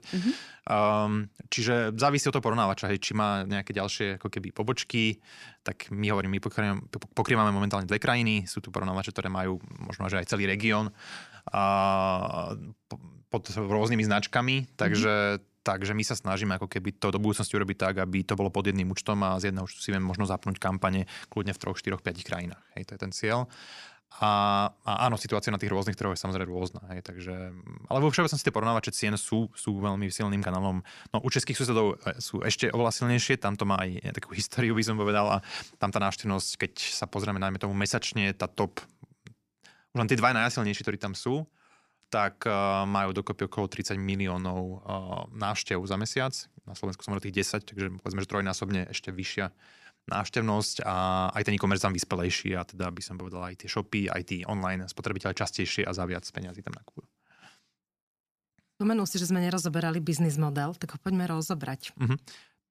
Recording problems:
none

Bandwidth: 14.5 kHz